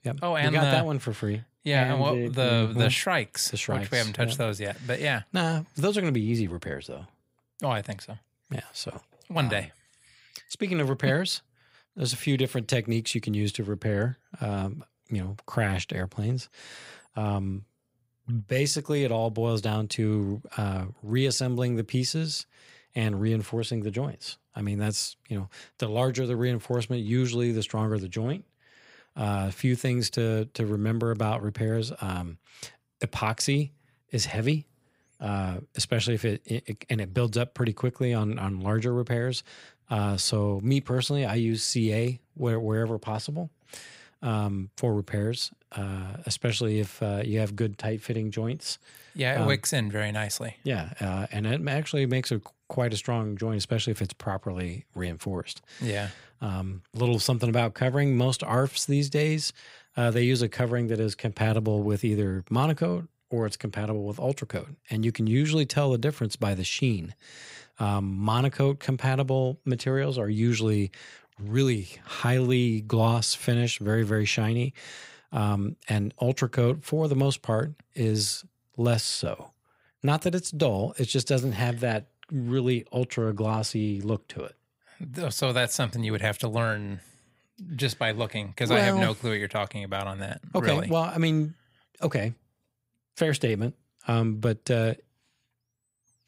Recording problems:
none

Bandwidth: 15.5 kHz